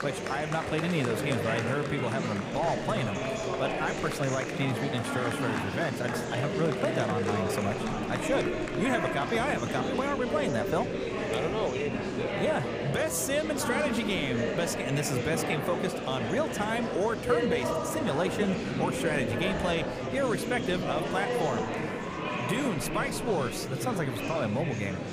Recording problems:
murmuring crowd; loud; throughout; 1 dB below the speech

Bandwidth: 15 kHz